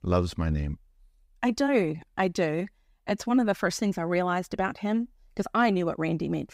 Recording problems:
none

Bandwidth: 15.5 kHz